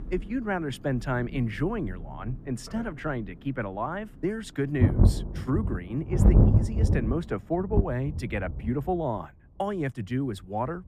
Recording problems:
muffled; slightly; fading above 3 kHz
rain or running water; very loud; throughout; 5 dB above the speech

